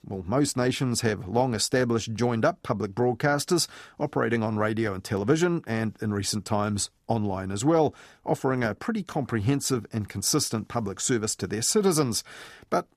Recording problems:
none

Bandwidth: 14.5 kHz